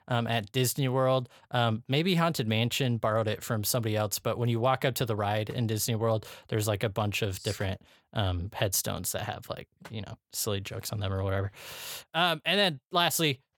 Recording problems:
none

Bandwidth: 18 kHz